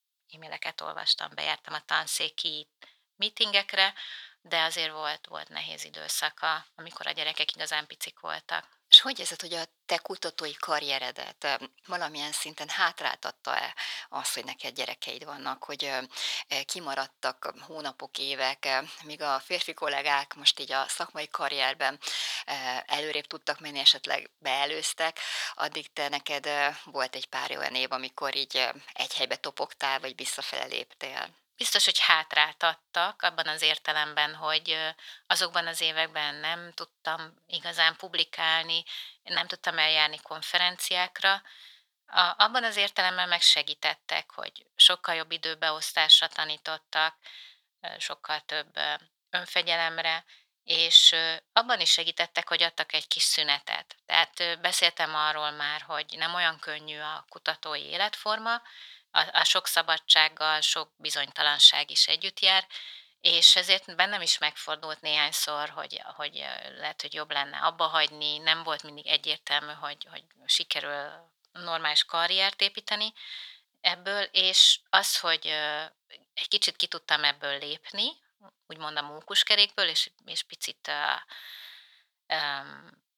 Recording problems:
thin; very; fading below 900 Hz

